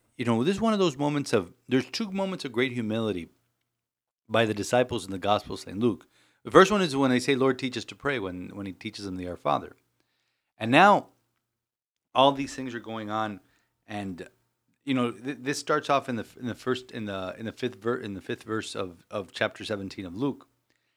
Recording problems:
none

